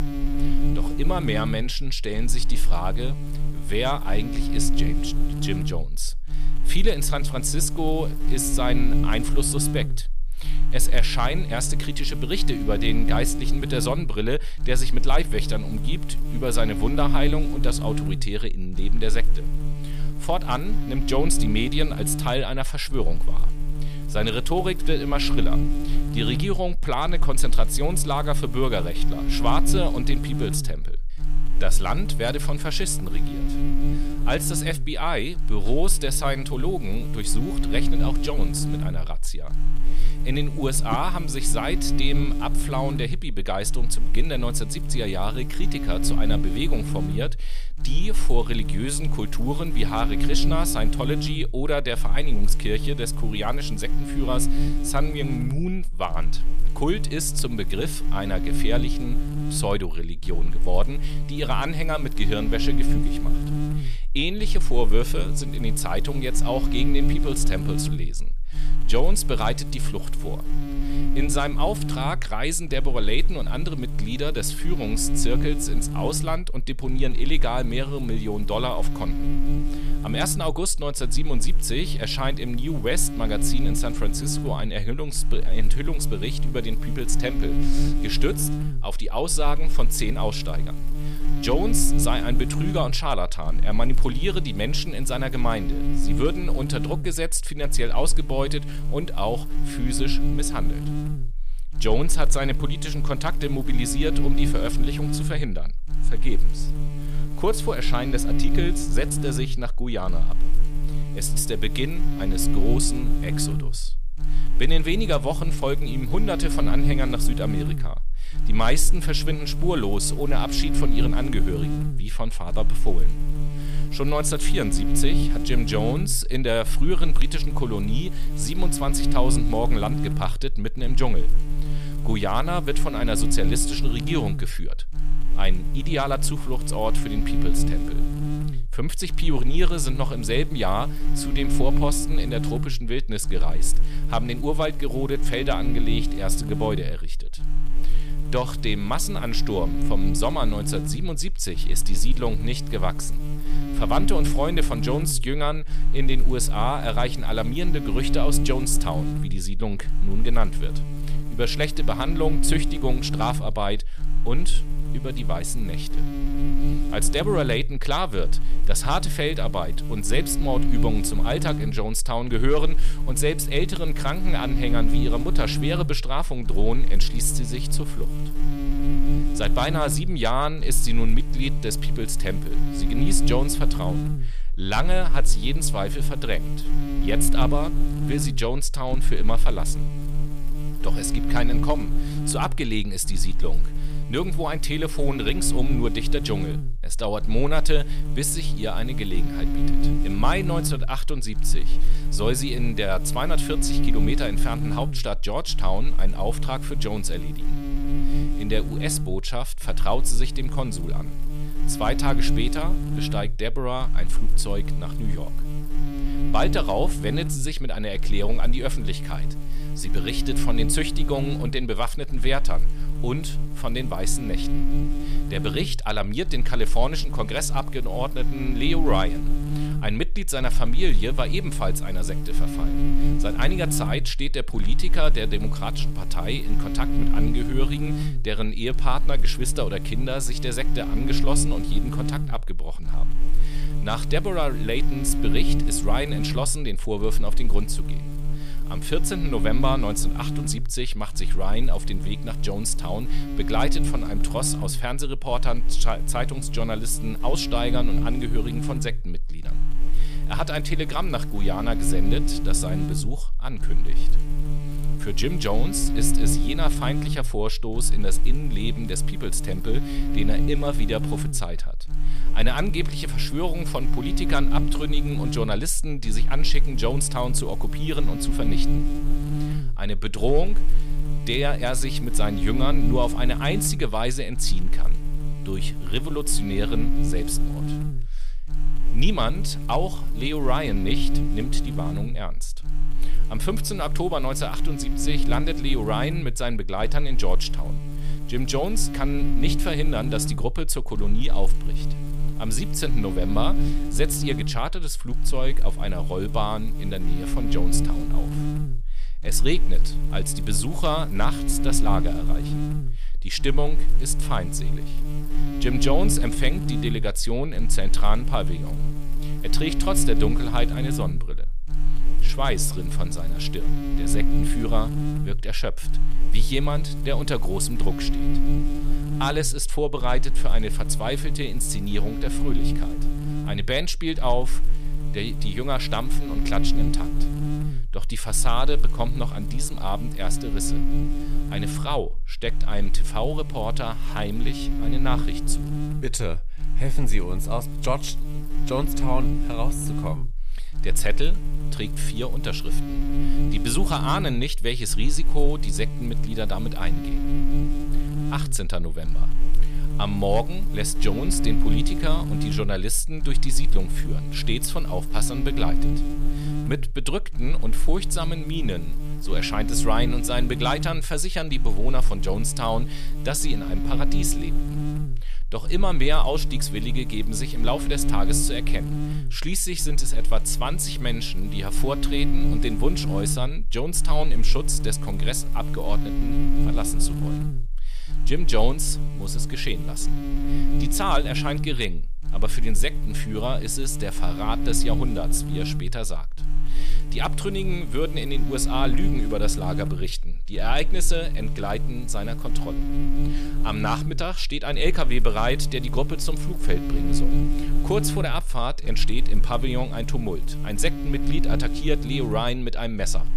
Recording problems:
electrical hum; very faint; throughout; 60 Hz, 8 dB below the speech

